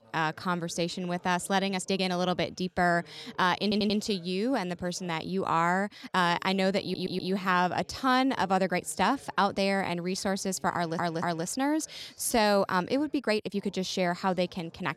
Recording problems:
background chatter; faint; throughout; 2 voices, 30 dB below the speech
uneven, jittery; strongly; from 2 to 14 s
audio stuttering; at 3.5 s, at 7 s and at 11 s

